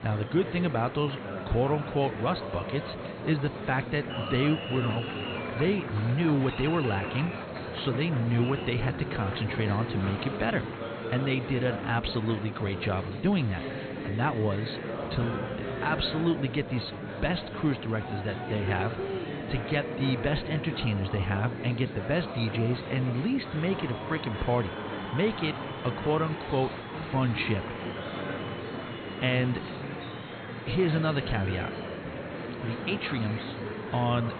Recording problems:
high frequencies cut off; severe; nothing above 4.5 kHz
murmuring crowd; loud; throughout; 6 dB below the speech

